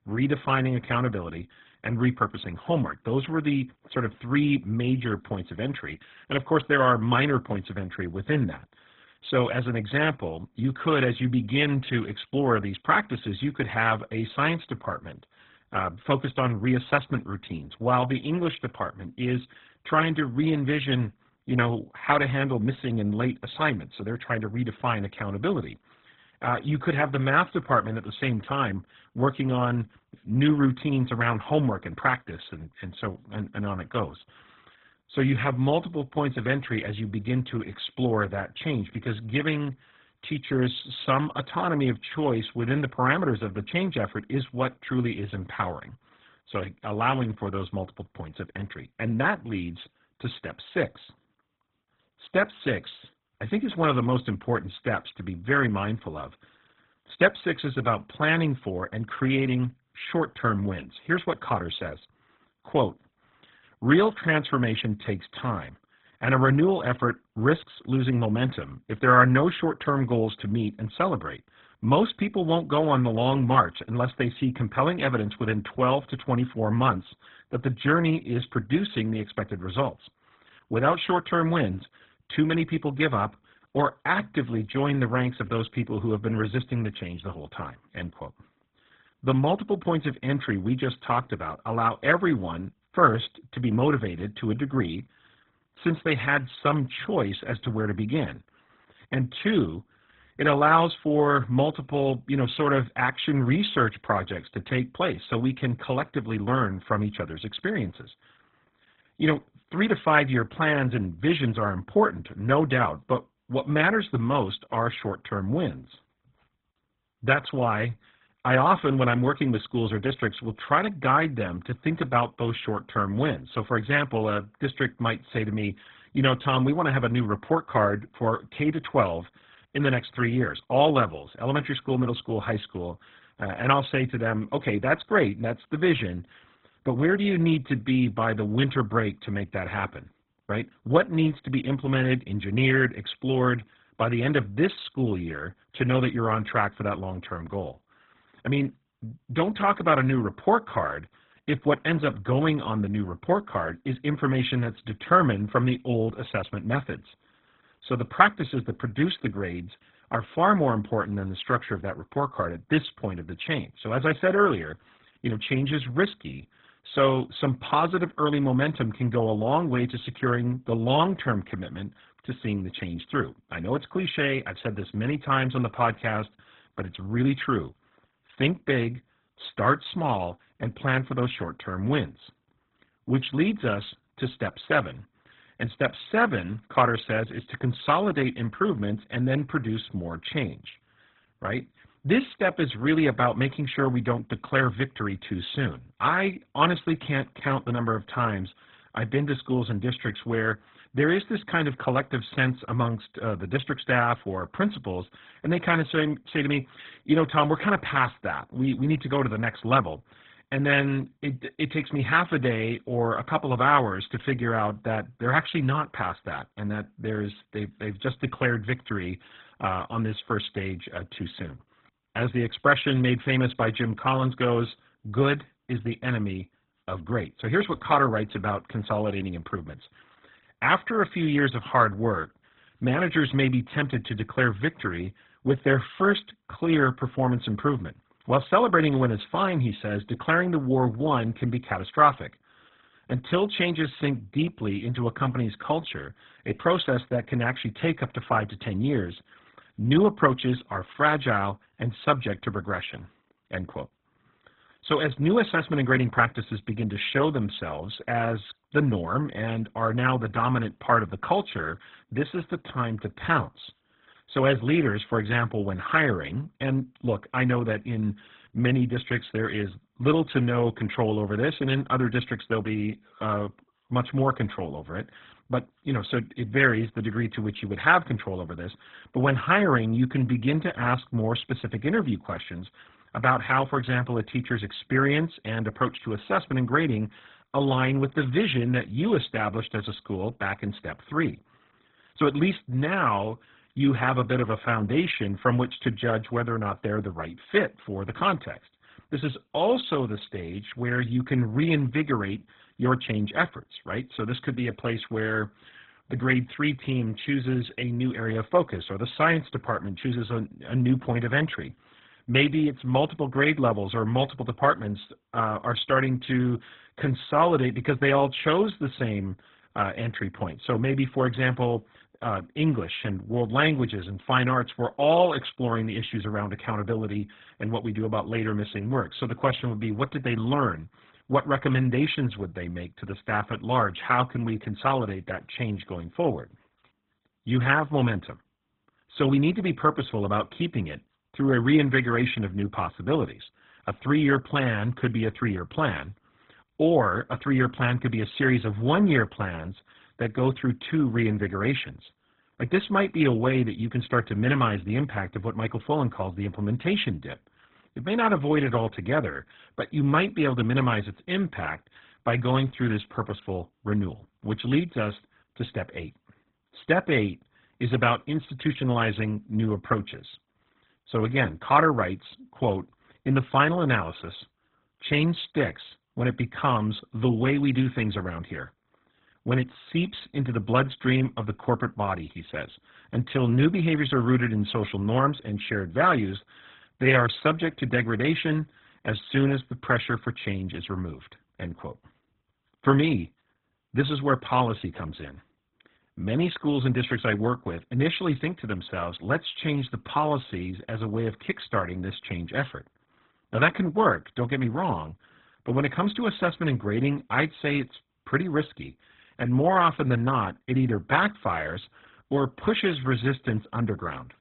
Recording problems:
garbled, watery; badly
high frequencies cut off; severe; nothing above 4 kHz

